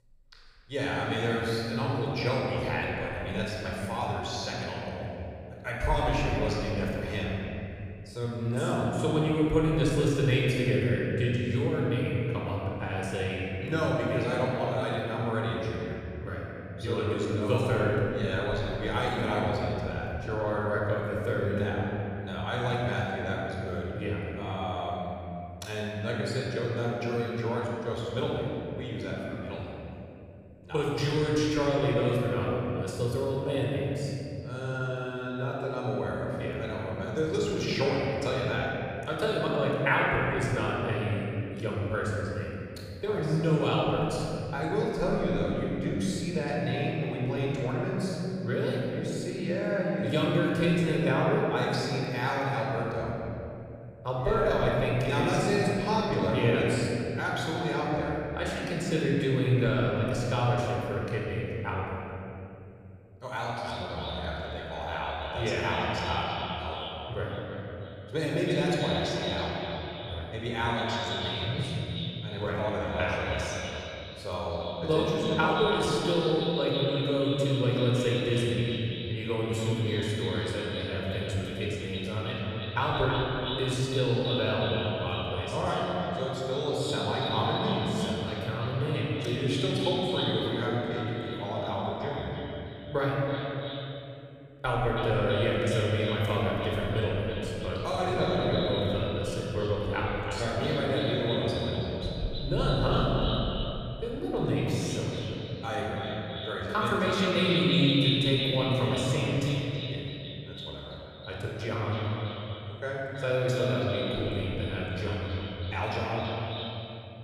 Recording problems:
echo of what is said; strong; from 1:03 on; 330 ms later, 7 dB below the speech
room echo; strong; dies away in 2.8 s
off-mic speech; far

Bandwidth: 15 kHz